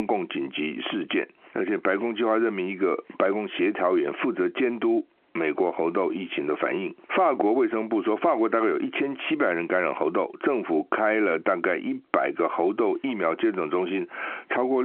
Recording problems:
muffled; very; fading above 3.5 kHz
phone-call audio
squashed, flat; somewhat
abrupt cut into speech; at the start and the end

